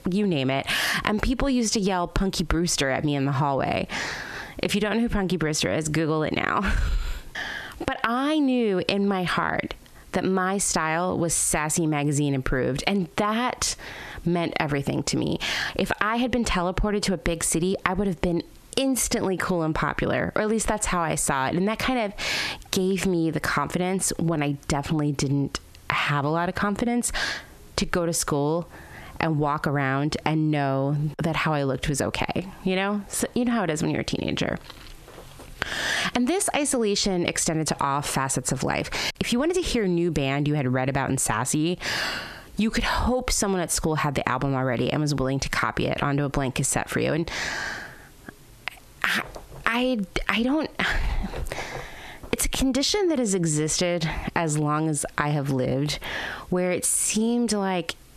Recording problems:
squashed, flat; heavily

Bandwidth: 13.5 kHz